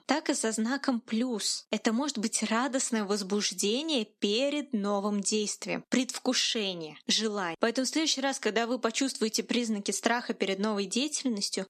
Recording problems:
squashed, flat; somewhat

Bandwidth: 13.5 kHz